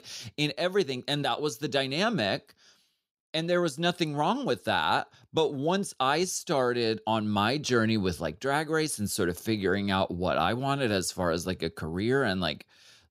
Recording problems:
none

